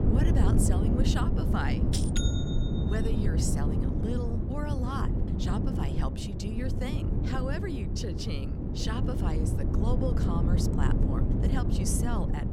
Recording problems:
wind noise on the microphone; heavy; as loud as the speech

